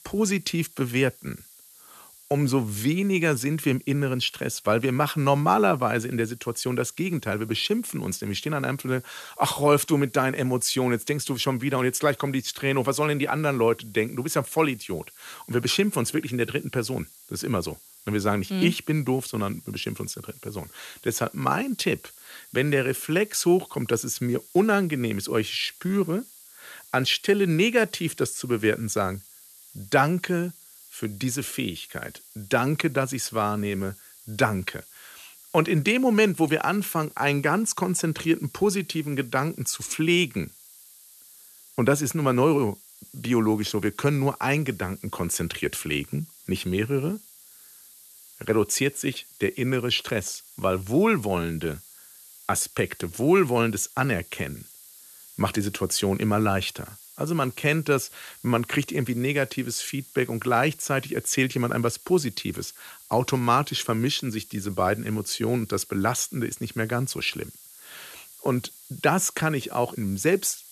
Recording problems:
hiss; faint; throughout; 20 dB below the speech

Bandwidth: 13.5 kHz